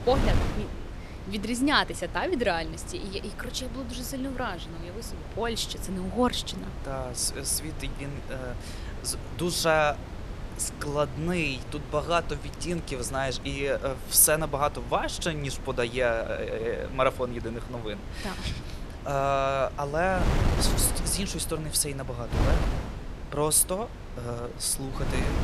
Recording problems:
wind noise on the microphone; occasional gusts; 10 dB below the speech

